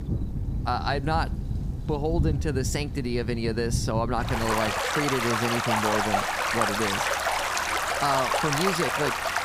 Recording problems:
rain or running water; very loud; throughout; 2 dB above the speech

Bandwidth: 15.5 kHz